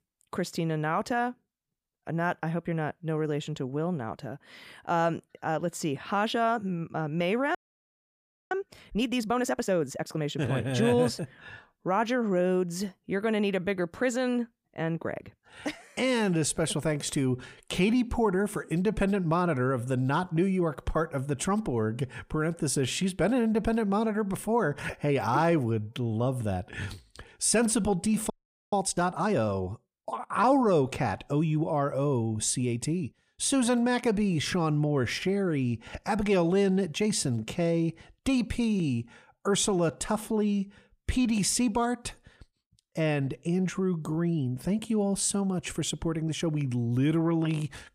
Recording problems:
audio freezing; at 7.5 s for 1 s and at 28 s

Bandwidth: 15.5 kHz